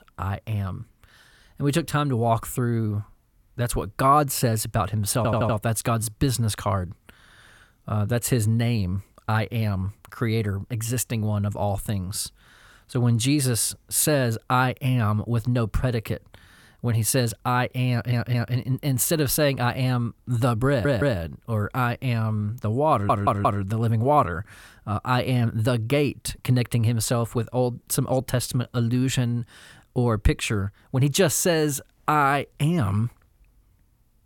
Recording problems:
audio stuttering; 4 times, first at 5 s

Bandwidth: 17 kHz